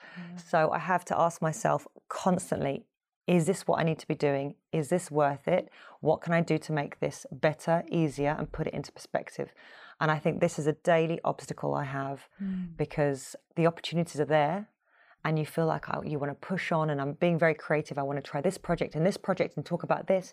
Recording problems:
none

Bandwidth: 15 kHz